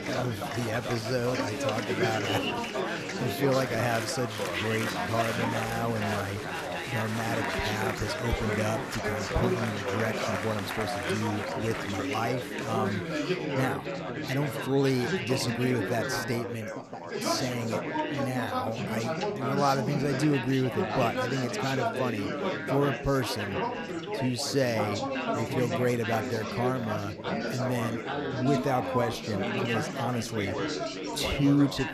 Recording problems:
chatter from many people; loud; throughout; 1 dB below the speech

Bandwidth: 14 kHz